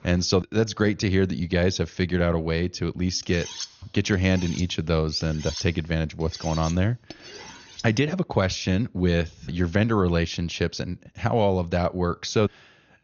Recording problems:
high frequencies cut off; noticeable; nothing above 6.5 kHz
clattering dishes; noticeable; from 3 to 8 s; peak 9 dB below the speech

